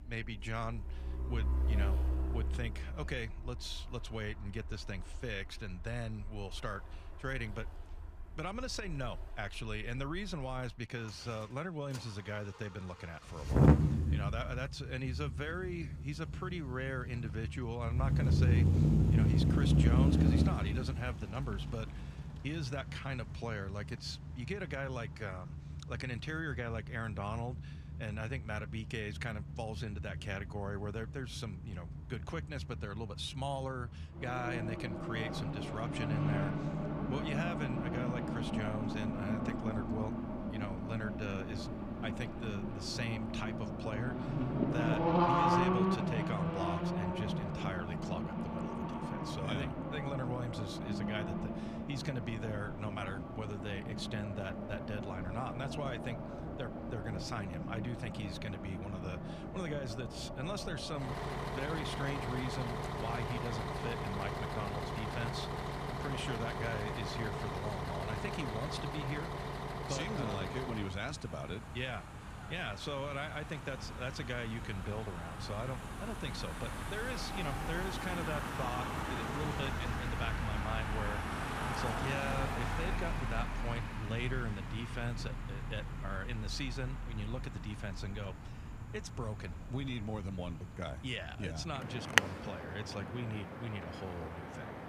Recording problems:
traffic noise; very loud; throughout; 4 dB above the speech

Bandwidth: 15 kHz